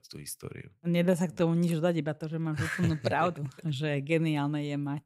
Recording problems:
uneven, jittery; strongly; from 0.5 to 4.5 s

